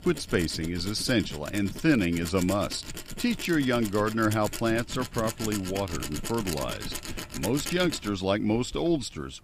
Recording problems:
machinery noise; loud; throughout; 9 dB below the speech

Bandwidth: 15 kHz